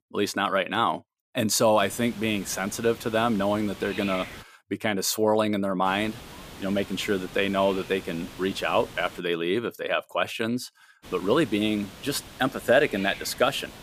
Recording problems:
hiss; noticeable; from 2 to 4.5 s, from 6 to 9 s and from 11 s on; 15 dB below the speech

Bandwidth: 15 kHz